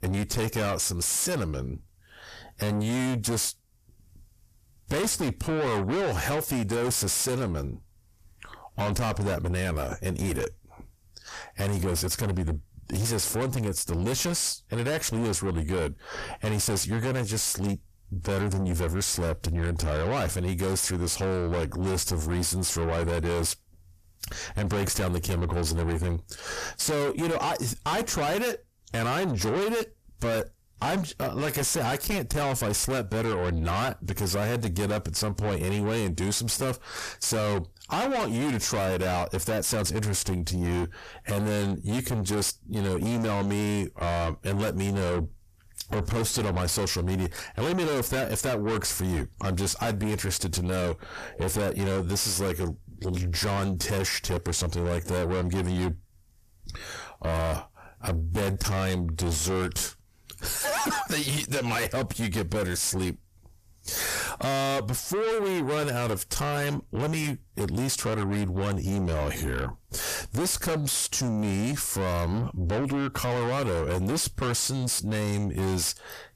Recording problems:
distortion; heavy; 6 dB below the speech

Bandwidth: 14.5 kHz